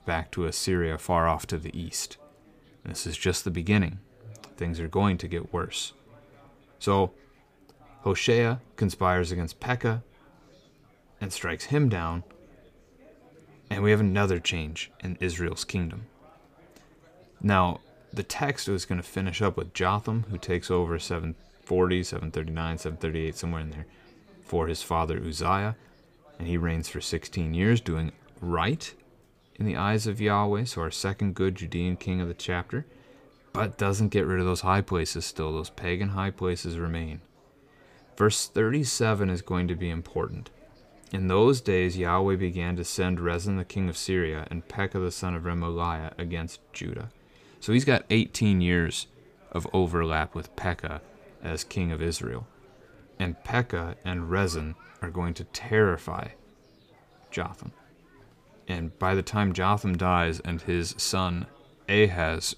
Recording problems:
chatter from many people; faint; throughout; 30 dB below the speech

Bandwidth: 15 kHz